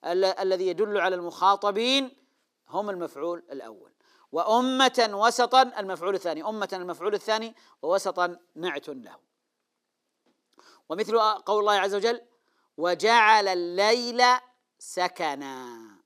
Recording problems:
thin; somewhat; fading below 300 Hz

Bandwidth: 15 kHz